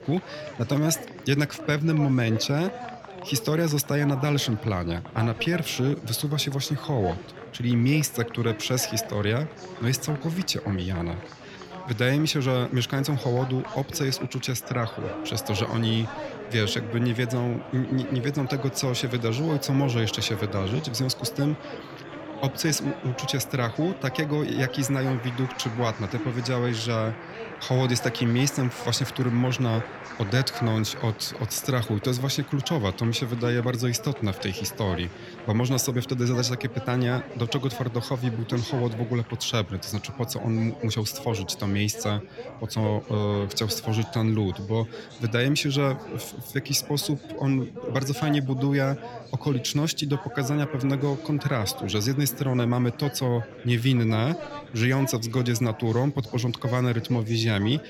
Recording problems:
chatter from many people; noticeable; throughout; 15 dB below the speech

